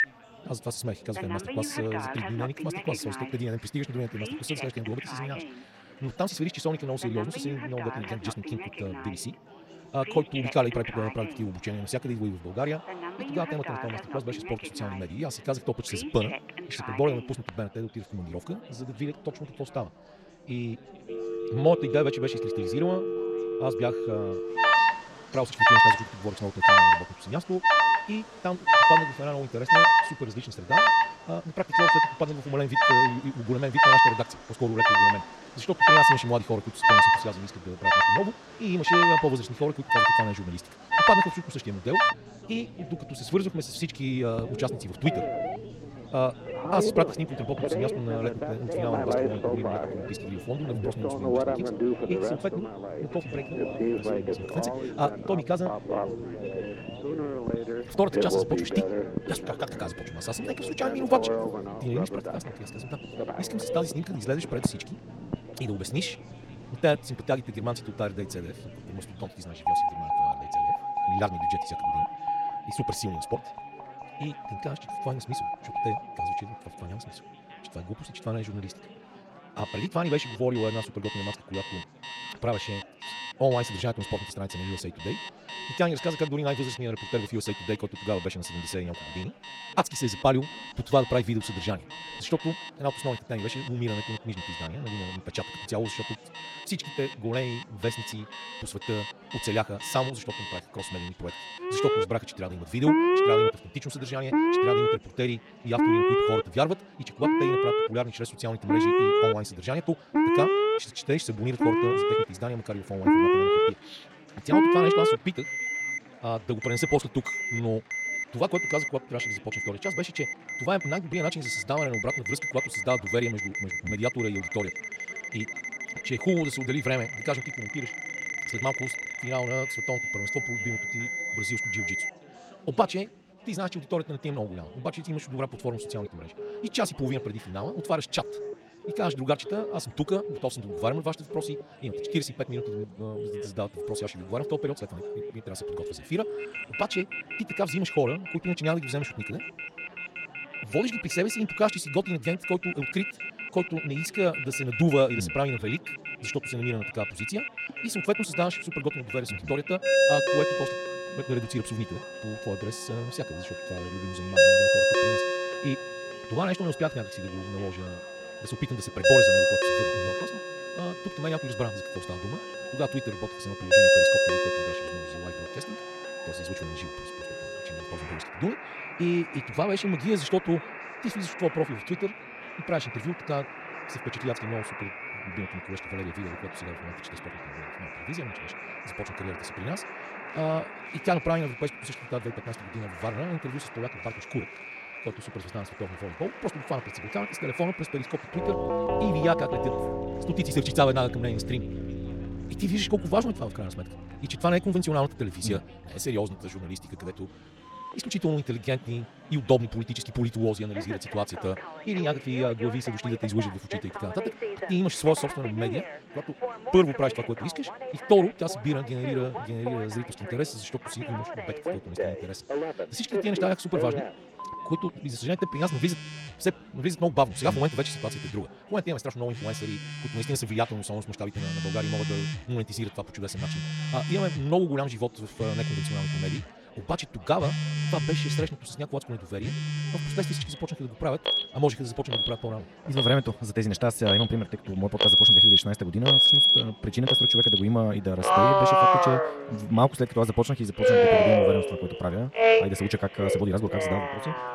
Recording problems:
wrong speed, natural pitch; too fast; 1.5 times normal speed
alarms or sirens; very loud; throughout; 5 dB above the speech
chatter from many people; noticeable; throughout; 20 dB below the speech

